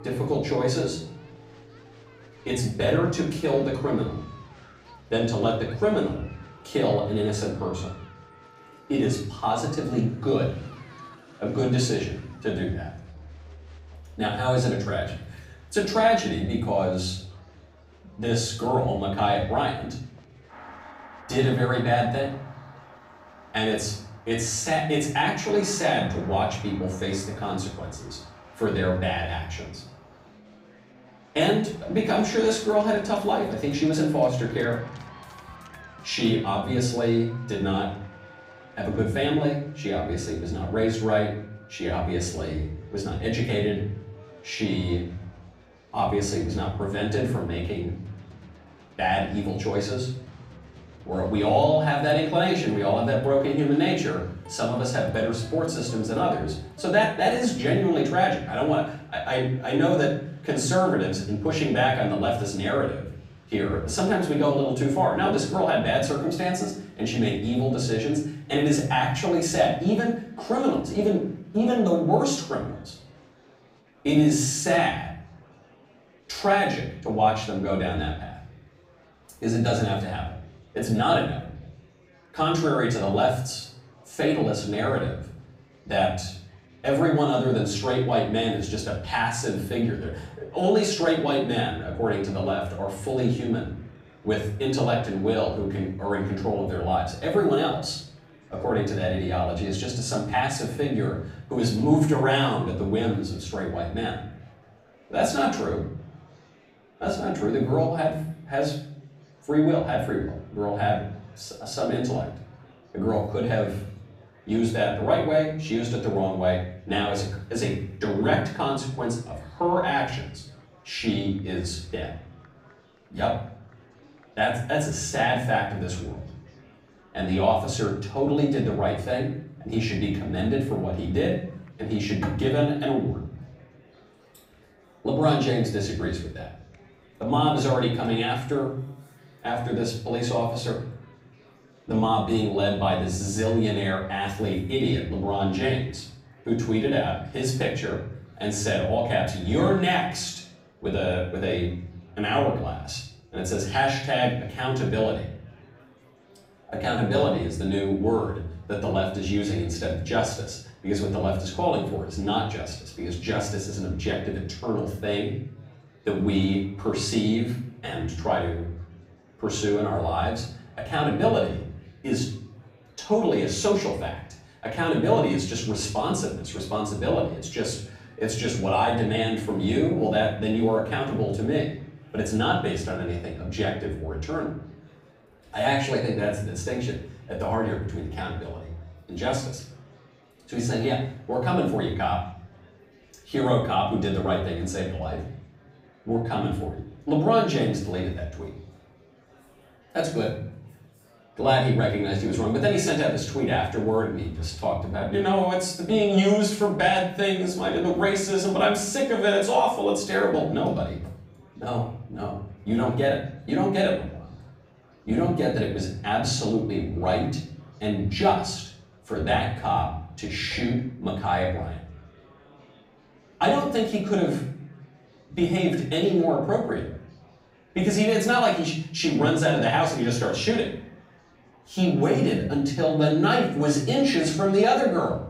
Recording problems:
off-mic speech; far
room echo; noticeable; dies away in 0.6 s
background music; faint; until 59 s; 25 dB below the speech
murmuring crowd; faint; throughout; 30 dB below the speech

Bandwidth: 15.5 kHz